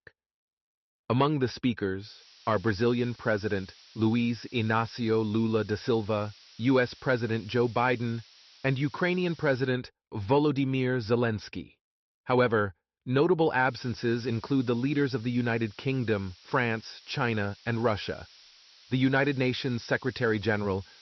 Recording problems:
high frequencies cut off; noticeable; nothing above 5.5 kHz
hiss; faint; from 2 to 9.5 s and from 14 s on; 25 dB below the speech

